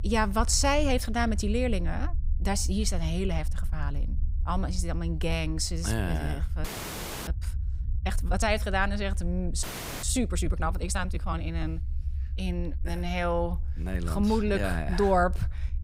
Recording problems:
low rumble; faint; throughout; 20 dB below the speech
audio freezing; at 6.5 s for 0.5 s and at 9.5 s

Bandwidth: 15.5 kHz